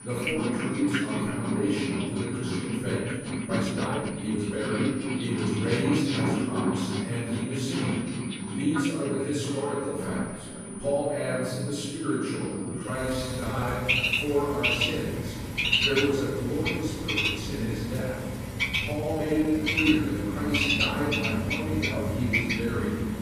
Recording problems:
room echo; strong; dies away in 1.5 s
off-mic speech; far
animal sounds; very loud; throughout; 1 dB above the speech
high-pitched whine; noticeable; until 13 s; 9.5 kHz, 15 dB below the speech
uneven, jittery; strongly; from 3.5 to 20 s

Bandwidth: 14.5 kHz